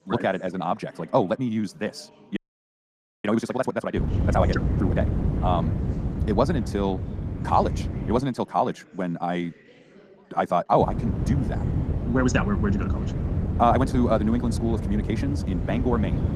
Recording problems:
wrong speed, natural pitch; too fast; 1.7 times normal speed
garbled, watery; slightly
wind noise on the microphone; occasional gusts; from 4 to 8 s and from 11 s on; 10 dB below the speech
chatter from many people; faint; throughout; 25 dB below the speech
audio freezing; at 2.5 s for 1 s

